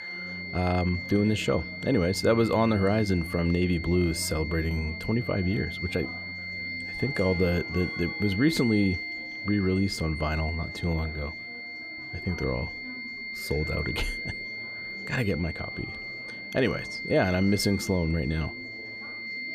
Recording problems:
high-pitched whine; loud; throughout; 2 kHz, 7 dB below the speech
background music; noticeable; throughout; 20 dB below the speech
chatter from many people; faint; throughout; 20 dB below the speech

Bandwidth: 15 kHz